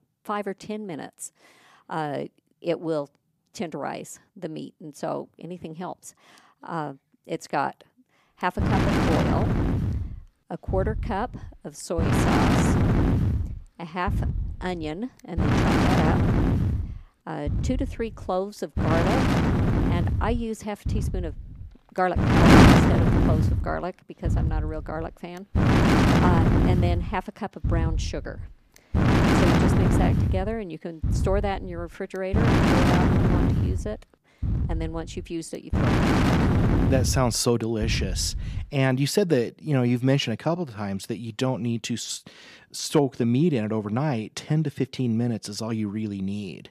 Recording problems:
wind noise on the microphone; heavy; from 8.5 to 39 s; 5 dB above the speech

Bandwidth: 15 kHz